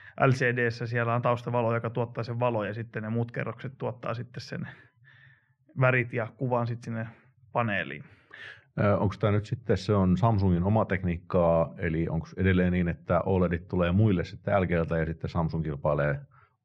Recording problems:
muffled; very; fading above 2 kHz

